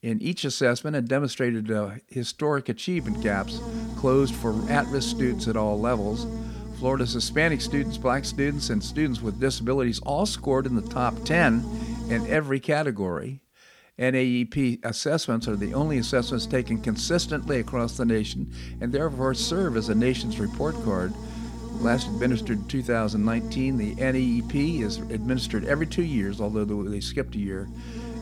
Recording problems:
electrical hum; noticeable; from 3 to 12 s and from 15 s on; 60 Hz, 15 dB below the speech

